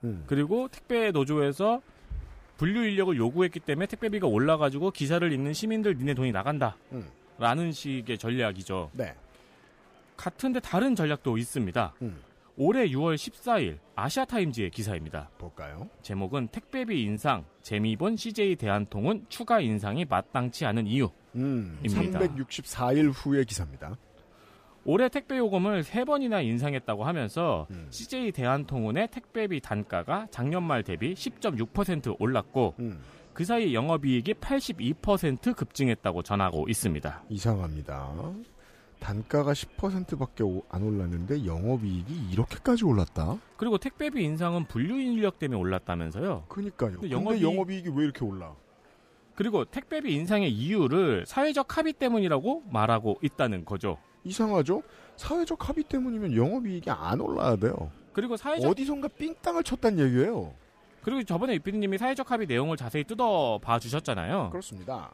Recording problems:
murmuring crowd; faint; throughout; 30 dB below the speech

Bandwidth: 15 kHz